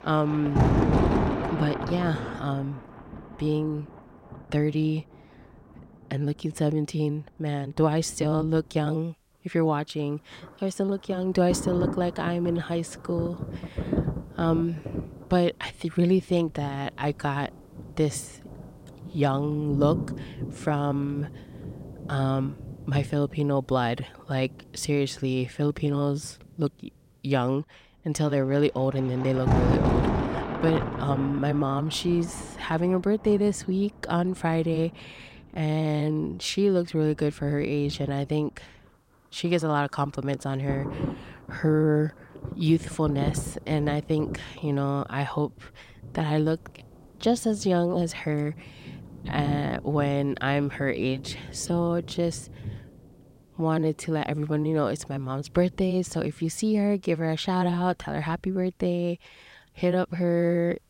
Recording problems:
rain or running water; loud; throughout; 5 dB below the speech

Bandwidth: 16 kHz